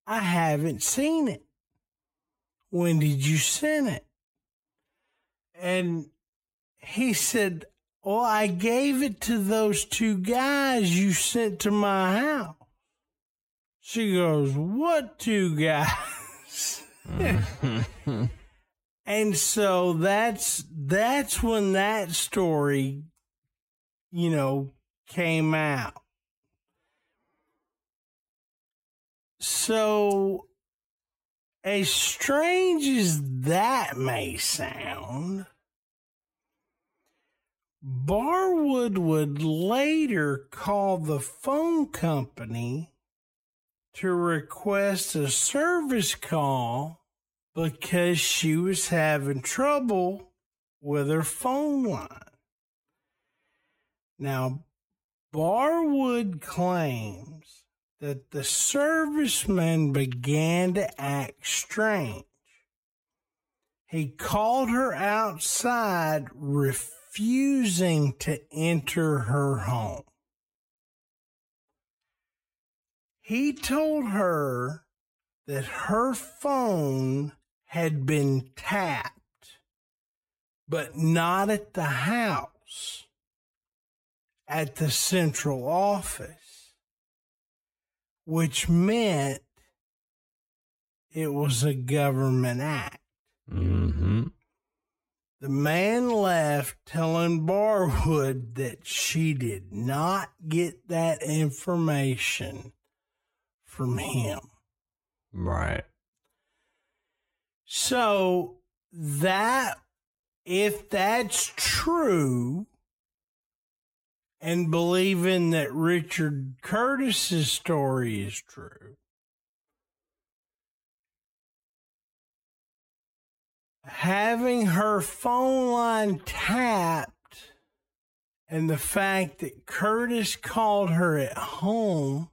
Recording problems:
wrong speed, natural pitch; too slow; 0.6 times normal speed

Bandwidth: 16 kHz